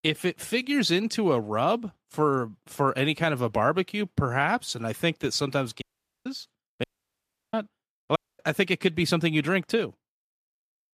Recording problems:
audio cutting out; at 6 s, at 7 s for 0.5 s and at 8 s

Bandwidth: 14.5 kHz